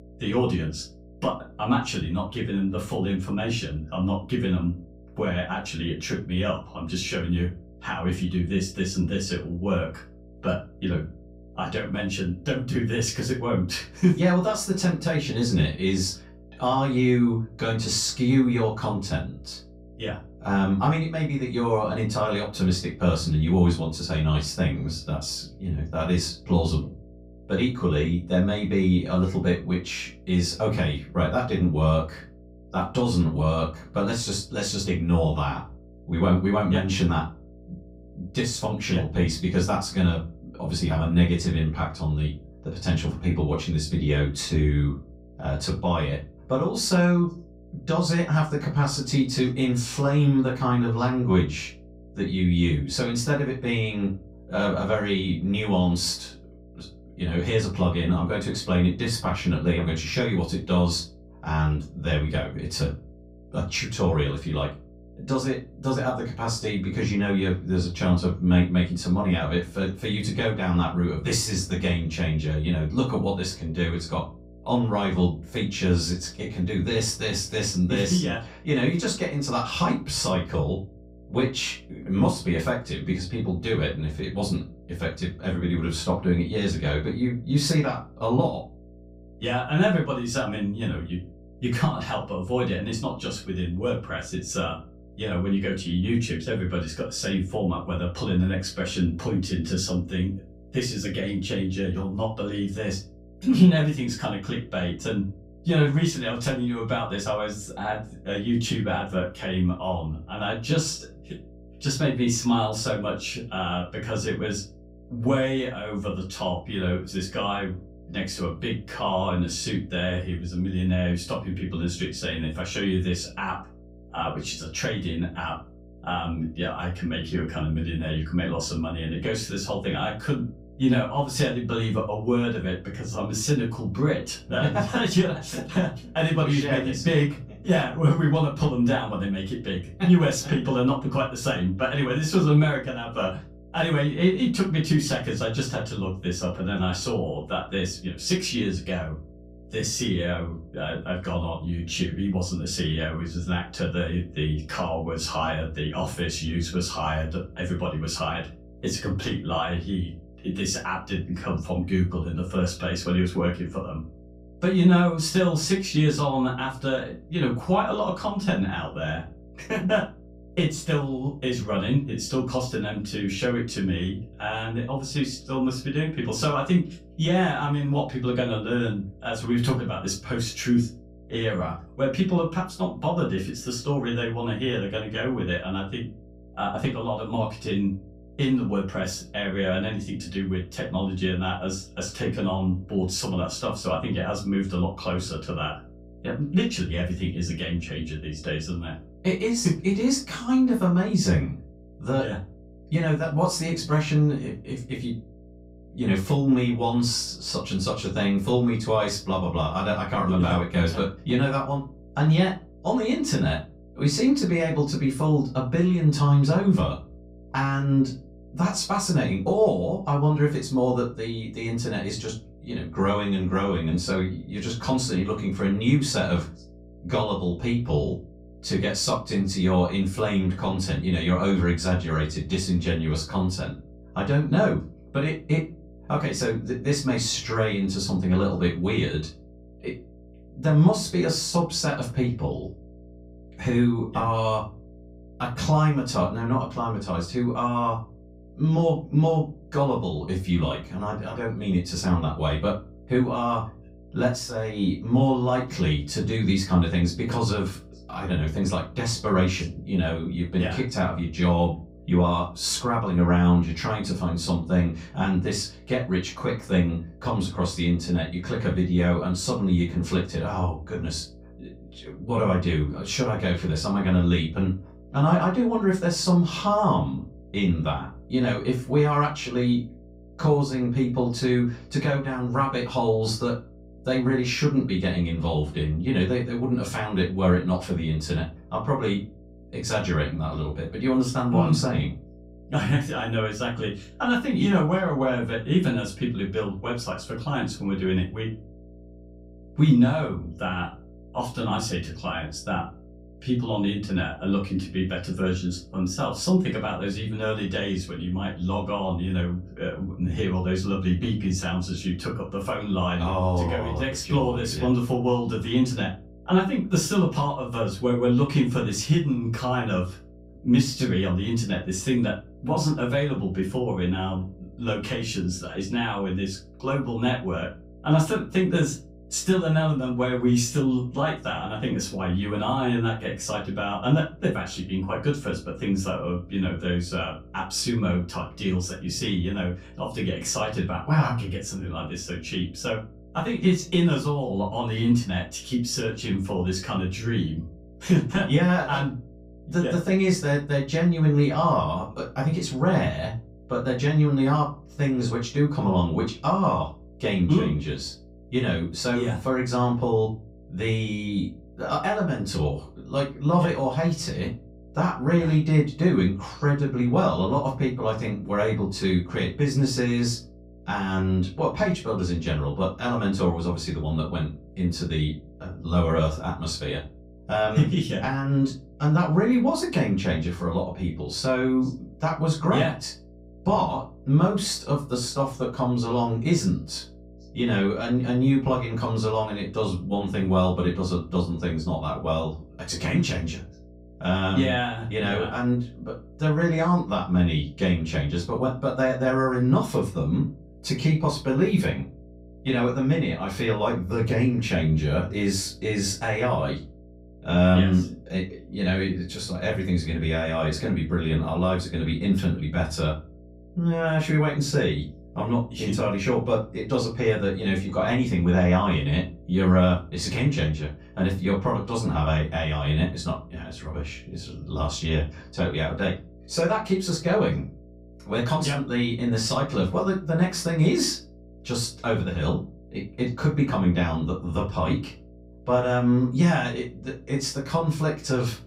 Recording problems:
off-mic speech; far
room echo; slight; dies away in 0.3 s
electrical hum; faint; throughout; 60 Hz, 25 dB below the speech

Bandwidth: 15.5 kHz